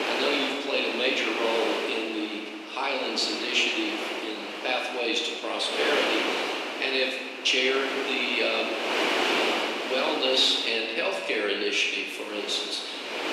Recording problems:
off-mic speech; far
room echo; noticeable; dies away in 1.3 s
thin; somewhat; fading below 250 Hz
wind noise on the microphone; heavy; 4 dB below the speech

